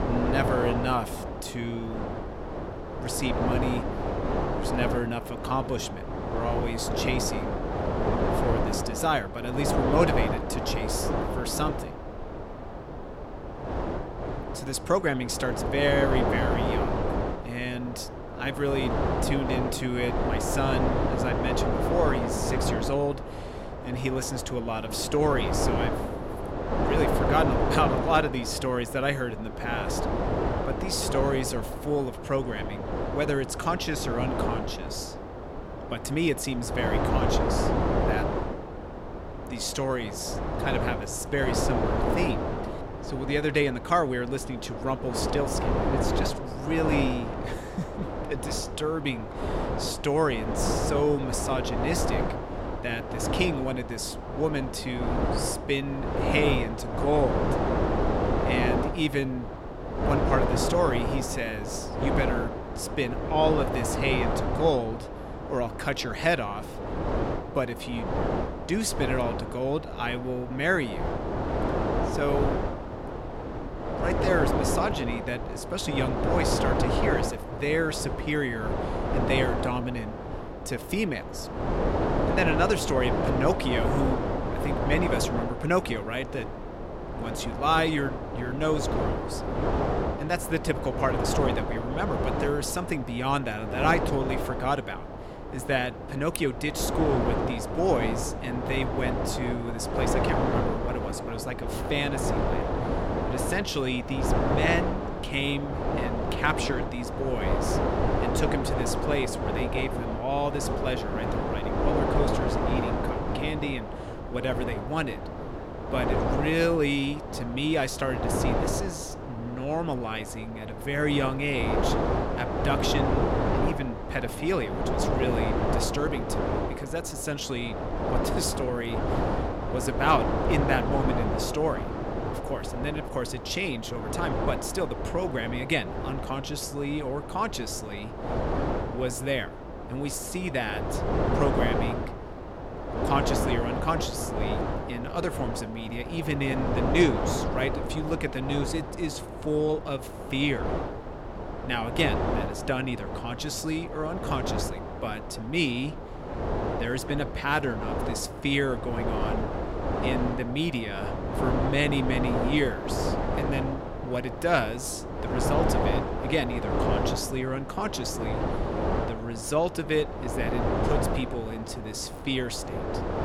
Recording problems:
wind noise on the microphone; heavy; 1 dB below the speech

